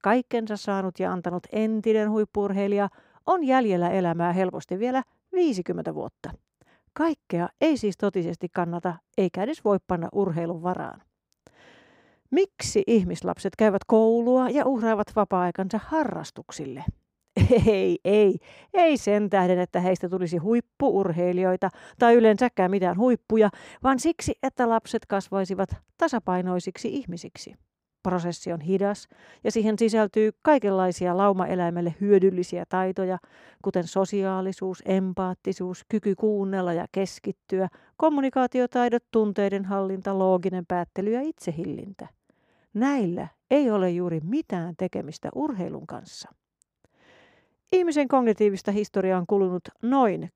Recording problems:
muffled; slightly; fading above 2 kHz

